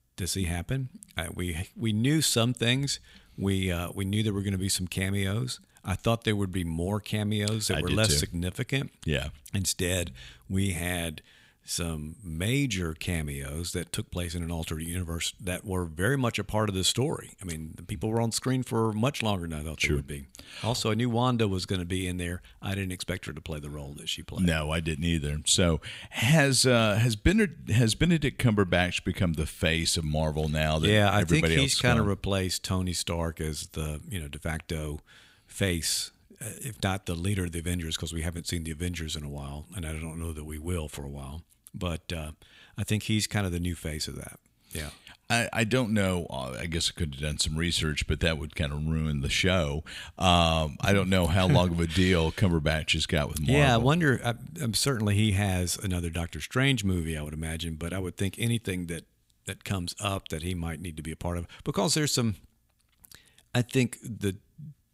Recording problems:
none

